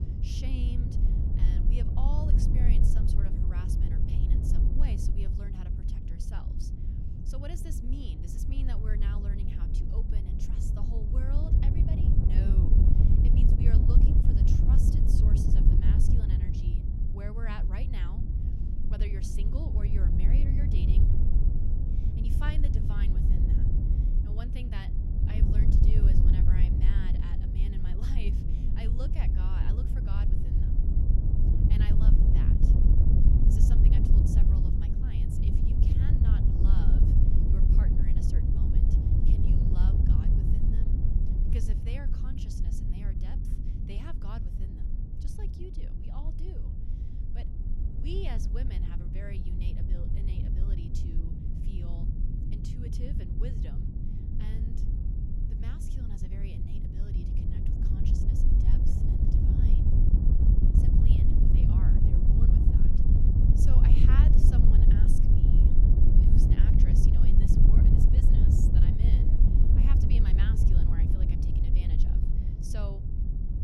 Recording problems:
wind noise on the microphone; heavy; 5 dB above the speech
low rumble; loud; throughout; 5 dB below the speech

